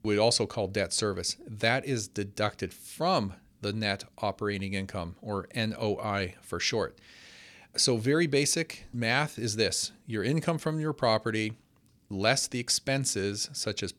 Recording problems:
none

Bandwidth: 18.5 kHz